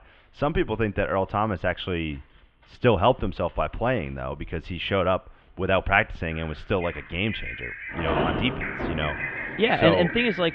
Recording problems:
muffled; very; fading above 3.5 kHz
animal sounds; loud; throughout; 9 dB below the speech
rain or running water; loud; throughout; 7 dB below the speech

